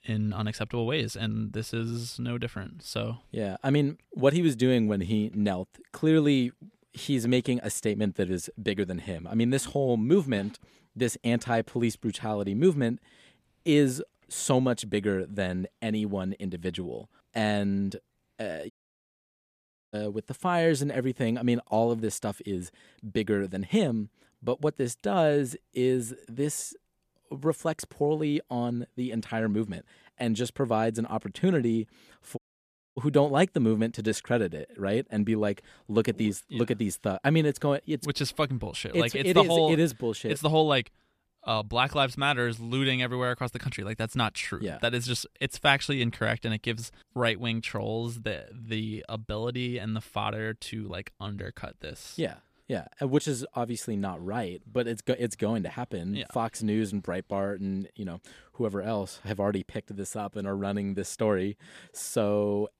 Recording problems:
audio cutting out; at 19 s for 1 s and at 32 s for 0.5 s

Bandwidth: 14.5 kHz